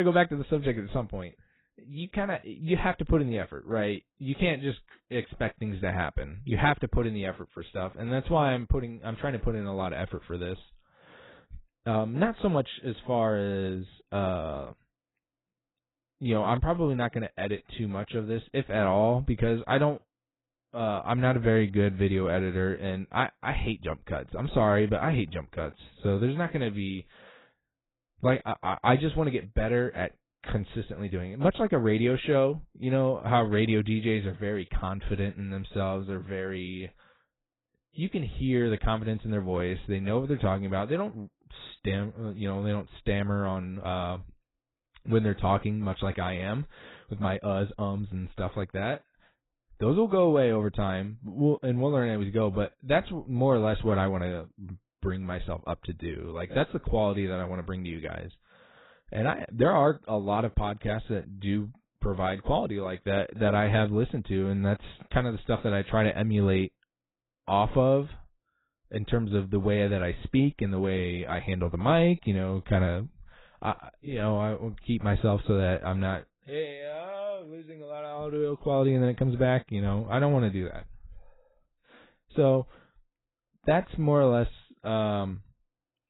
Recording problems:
garbled, watery; badly; nothing above 4 kHz
abrupt cut into speech; at the start

